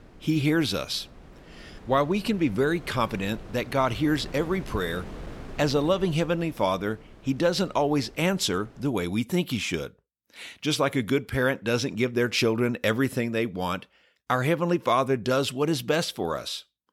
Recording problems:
wind noise on the microphone; occasional gusts; until 9 s; 20 dB below the speech

